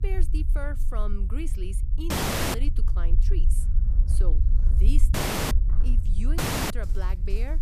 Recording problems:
animal sounds; loud; from 2.5 s on; 8 dB below the speech
low rumble; loud; throughout; 7 dB below the speech
audio cutting out; at 2 s, at 5 s and at 6.5 s

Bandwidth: 14.5 kHz